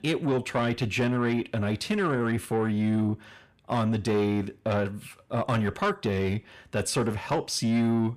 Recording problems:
distortion; slight; 10 dB below the speech

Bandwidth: 15 kHz